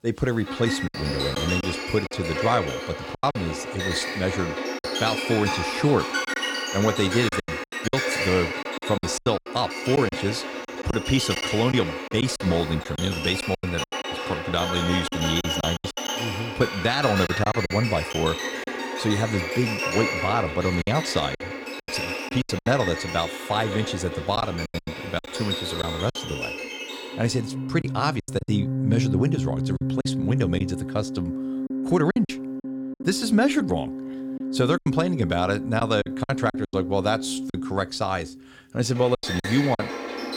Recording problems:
background music; loud; throughout; 3 dB below the speech
choppy; very; 8% of the speech affected

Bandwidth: 17 kHz